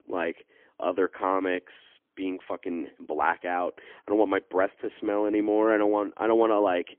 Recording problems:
phone-call audio; poor line; nothing above 3.5 kHz

